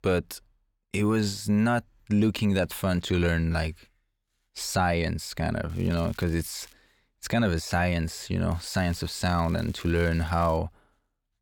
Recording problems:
crackling; faint; from 5.5 to 6.5 s and from 8.5 to 11 s; 25 dB below the speech

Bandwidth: 17.5 kHz